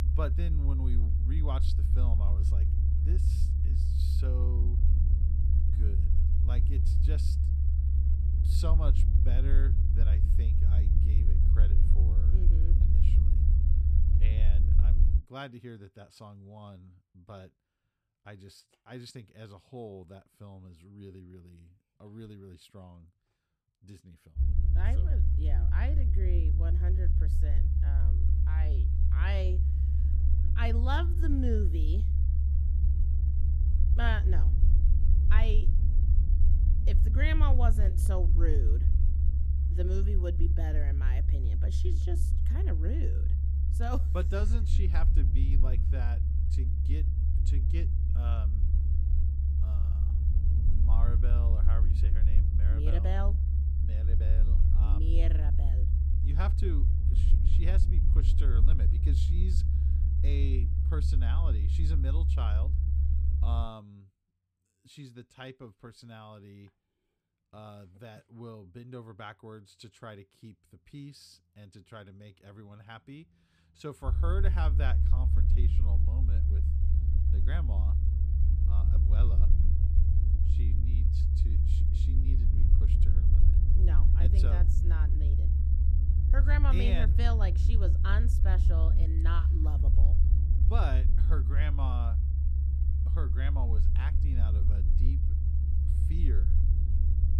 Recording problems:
low rumble; loud; until 15 s, from 24 s to 1:04 and from 1:14 on; 3 dB below the speech

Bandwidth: 14.5 kHz